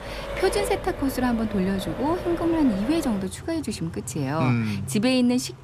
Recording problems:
traffic noise; loud; throughout; 10 dB below the speech

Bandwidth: 14.5 kHz